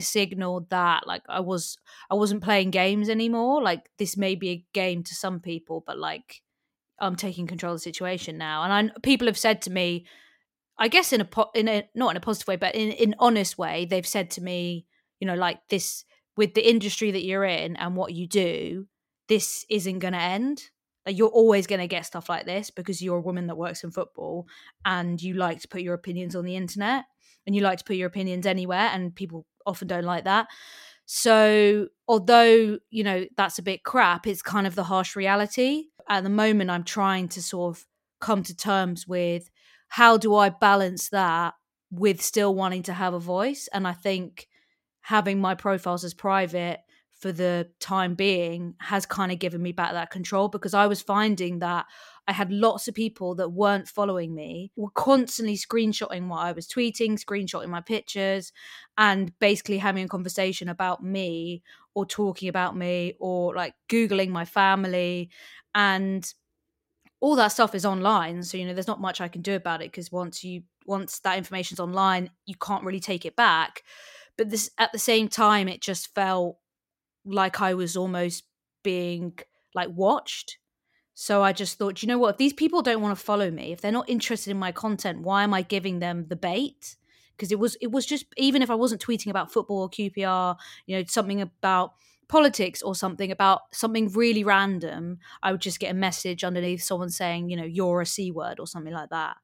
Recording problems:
abrupt cut into speech; at the start

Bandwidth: 16.5 kHz